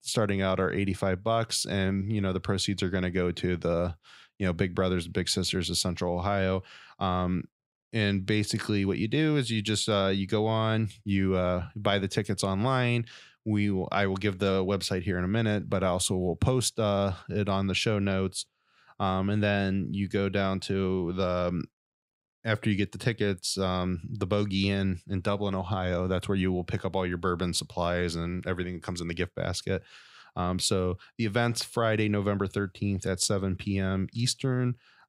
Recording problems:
none

